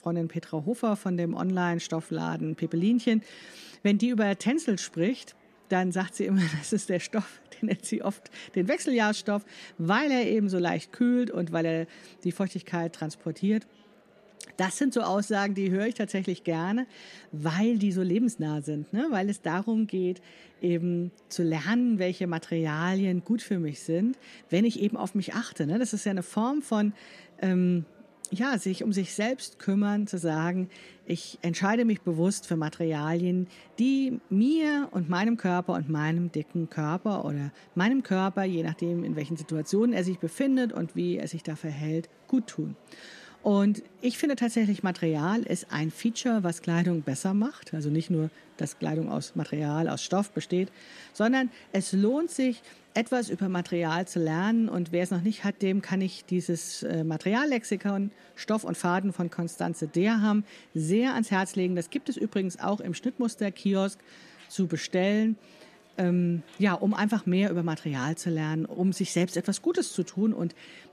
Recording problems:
murmuring crowd; faint; throughout; 30 dB below the speech

